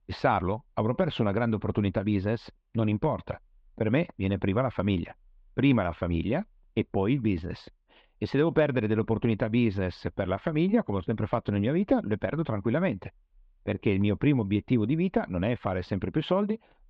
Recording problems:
muffled; slightly; fading above 3 kHz

